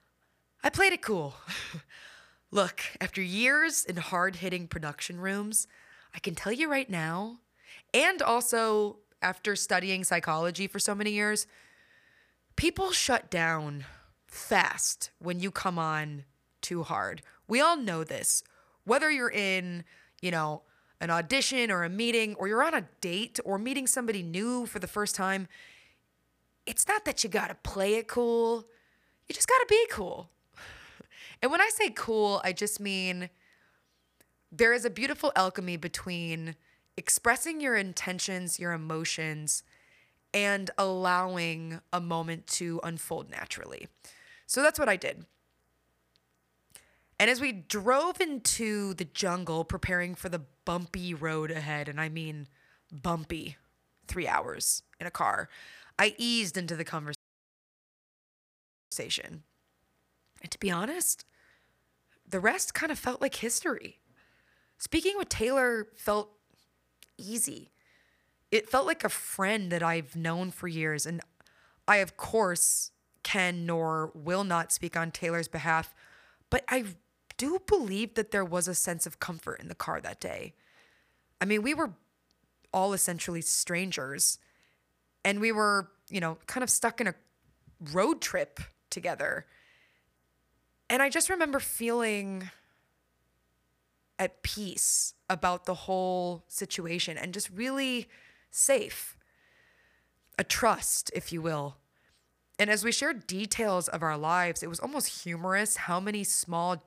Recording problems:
audio cutting out; at 57 s for 2 s

